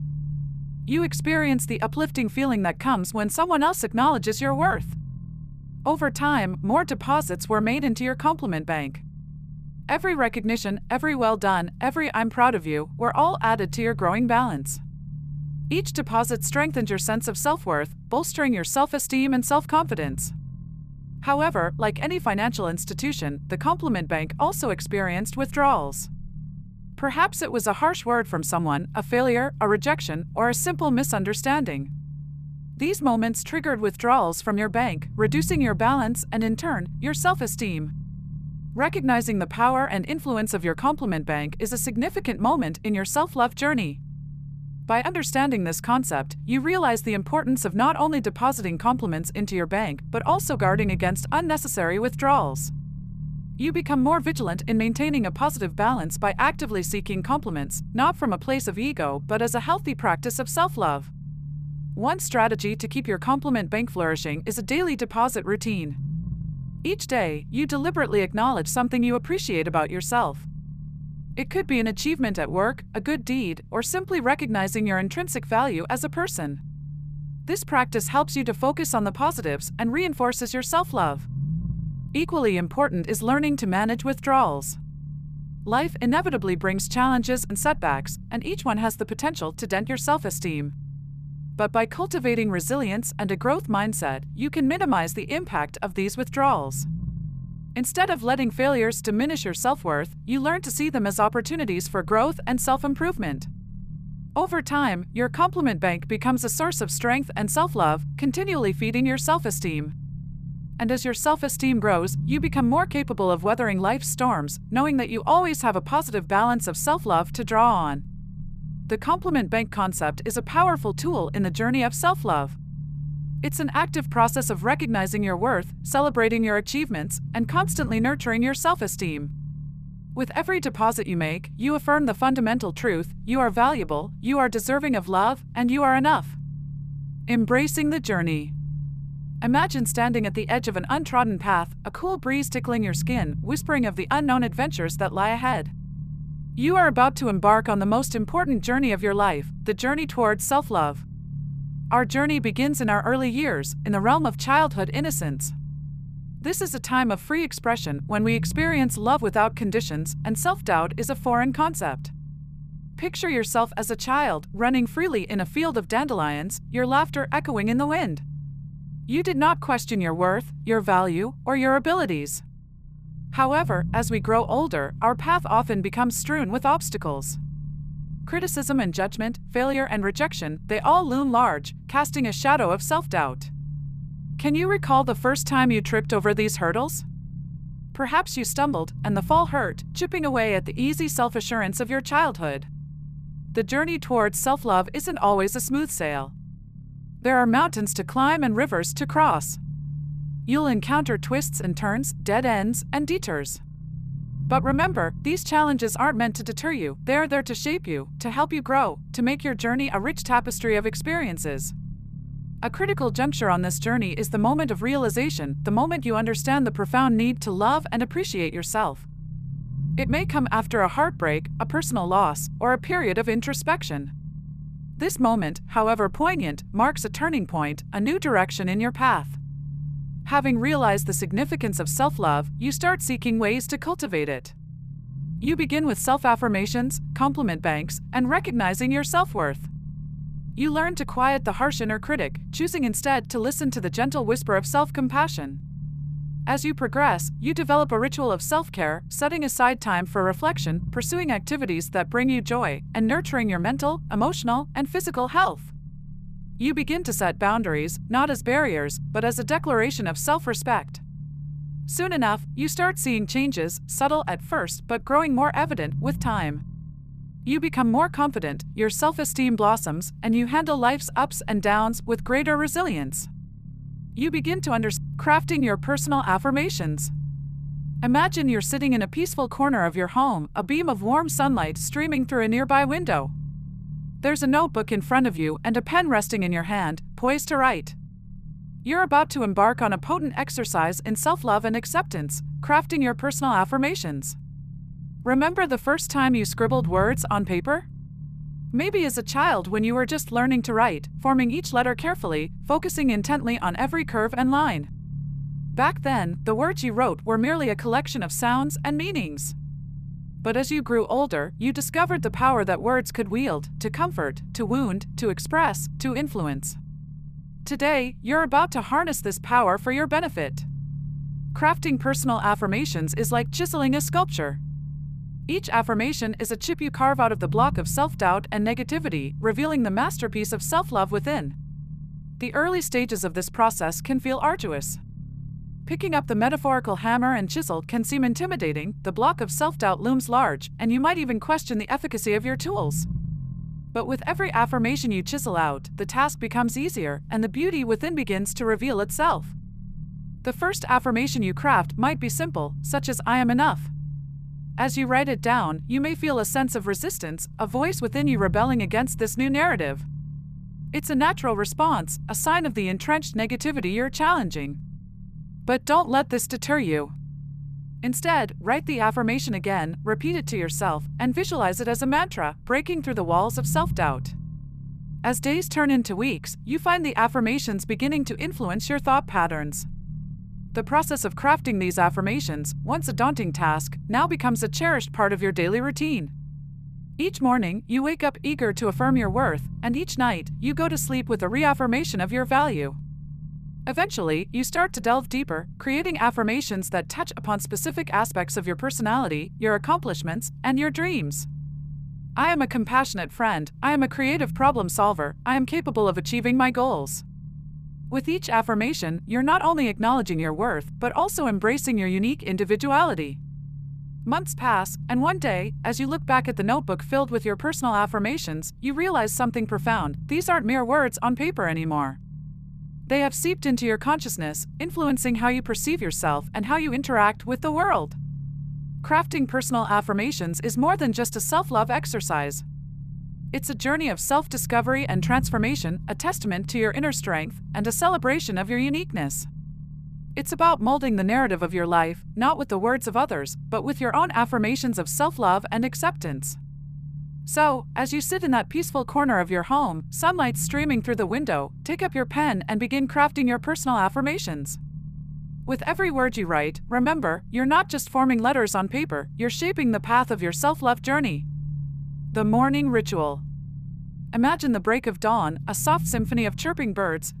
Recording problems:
low rumble; faint; throughout; 25 dB below the speech

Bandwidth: 14.5 kHz